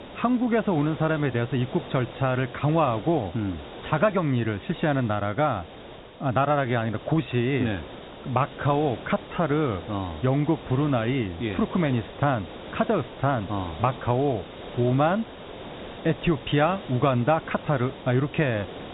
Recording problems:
high frequencies cut off; severe; nothing above 4 kHz
hiss; noticeable; throughout; 15 dB below the speech

